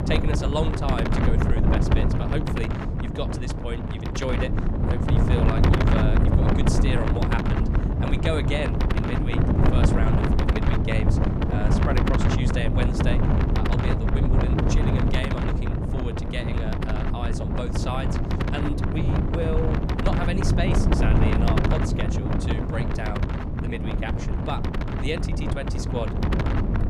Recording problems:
wind noise on the microphone; heavy; 2 dB above the speech

